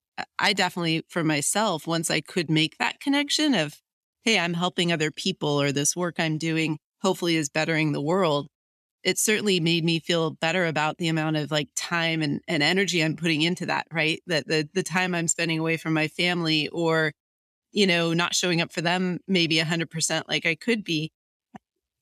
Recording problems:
none

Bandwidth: 14 kHz